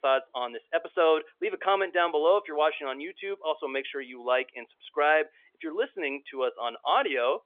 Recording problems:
phone-call audio; nothing above 3.5 kHz

